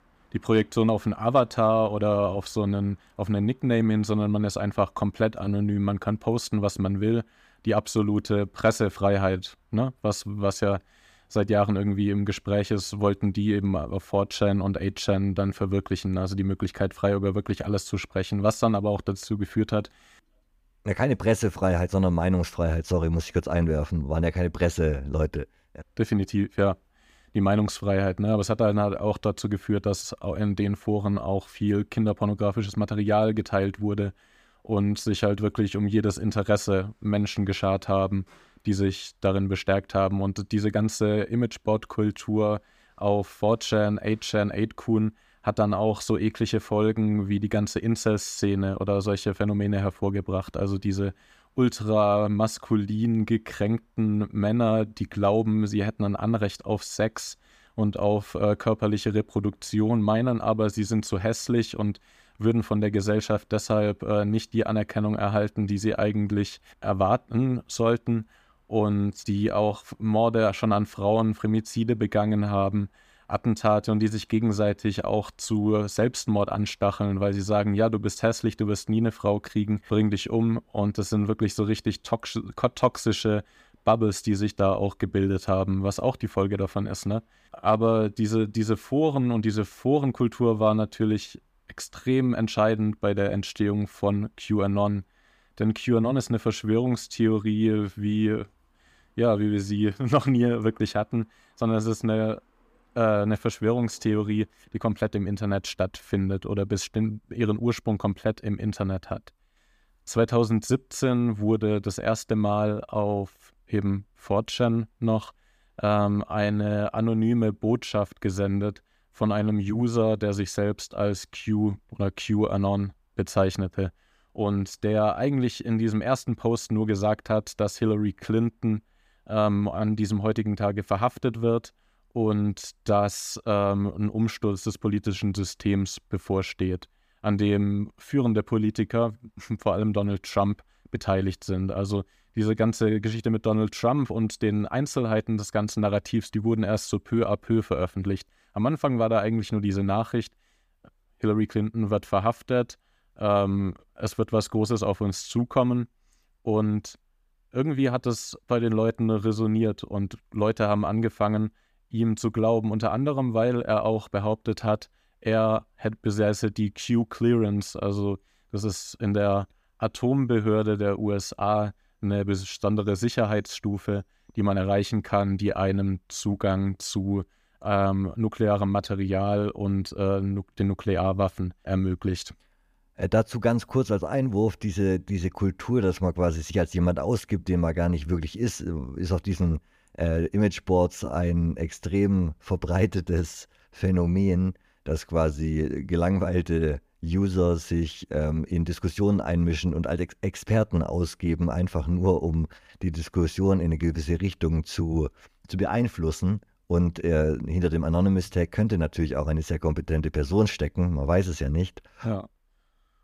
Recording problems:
none

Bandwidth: 15 kHz